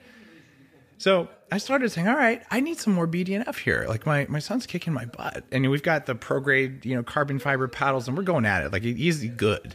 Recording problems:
voice in the background; faint; throughout; 30 dB below the speech

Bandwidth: 15 kHz